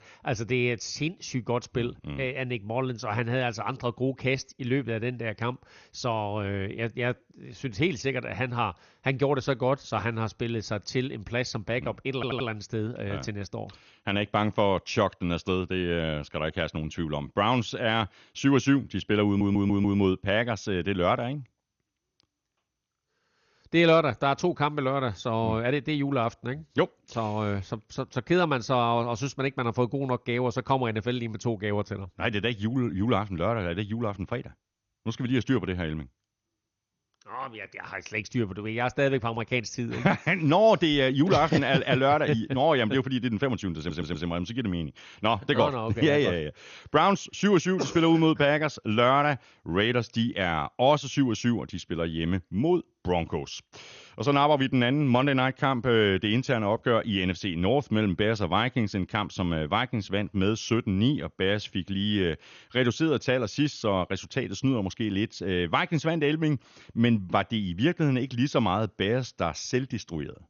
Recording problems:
garbled, watery; slightly; nothing above 6.5 kHz
audio stuttering; at 12 s, at 19 s and at 44 s

